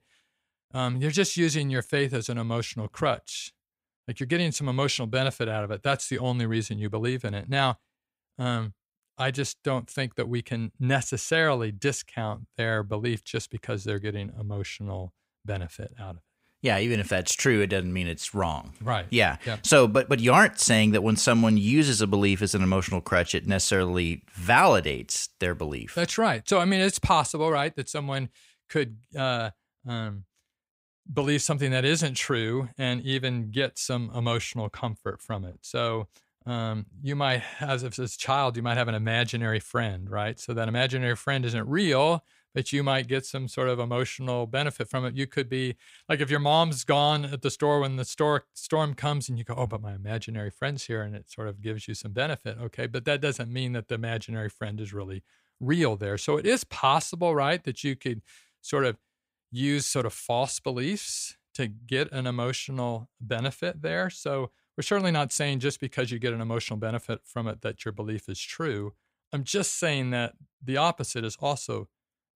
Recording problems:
none

